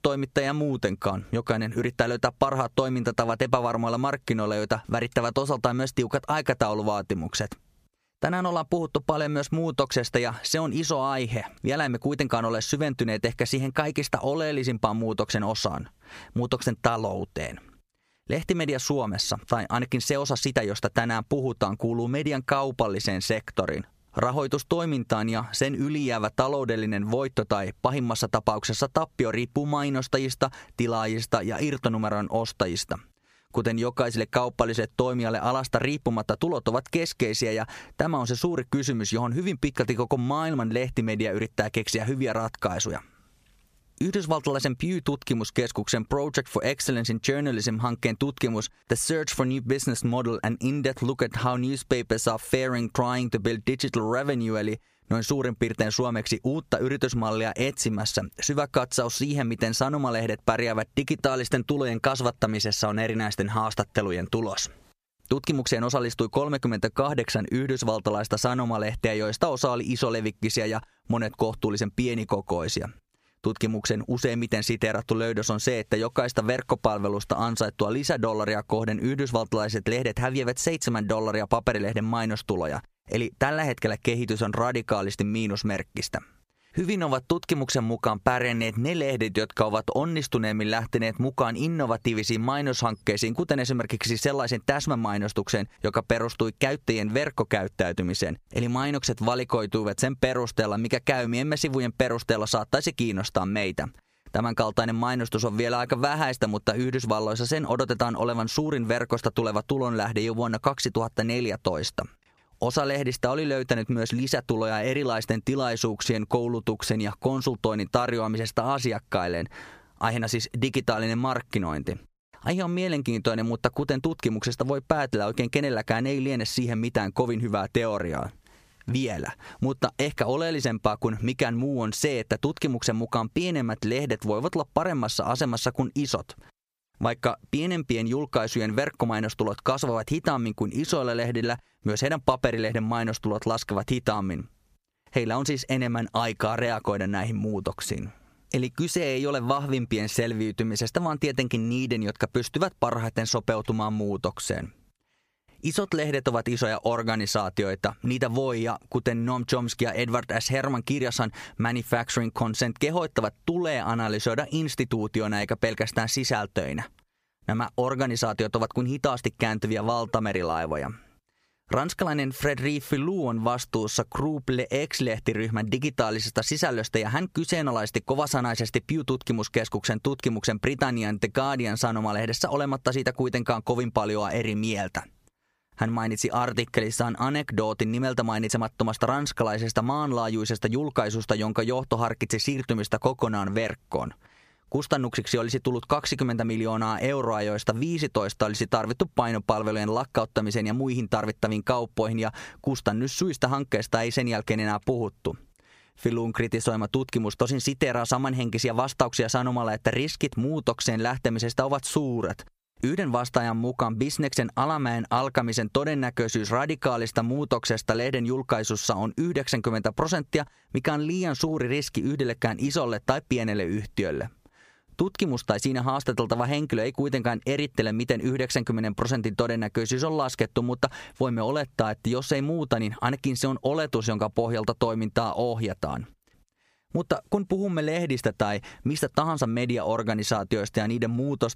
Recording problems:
squashed, flat; somewhat

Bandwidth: 15 kHz